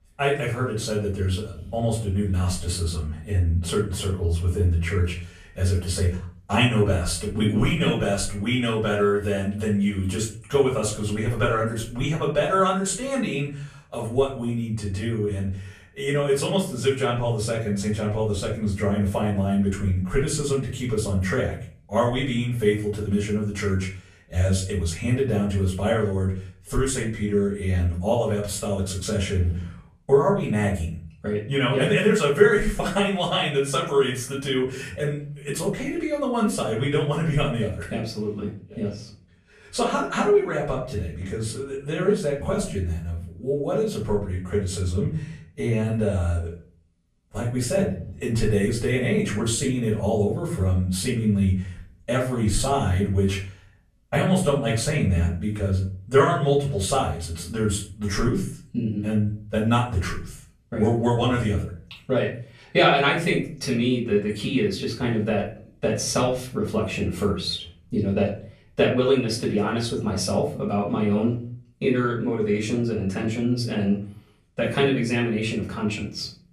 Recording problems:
off-mic speech; far
room echo; slight; dies away in 0.4 s

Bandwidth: 14.5 kHz